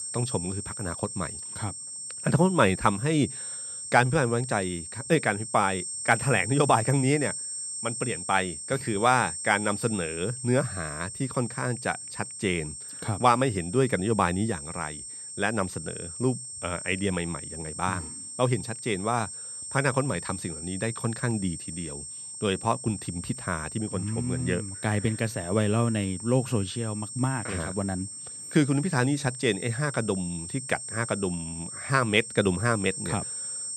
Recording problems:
high-pitched whine; loud; throughout; 8.5 kHz, 7 dB below the speech

